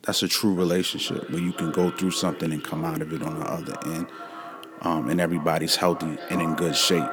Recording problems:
echo of what is said; noticeable; throughout; 490 ms later, 10 dB below the speech

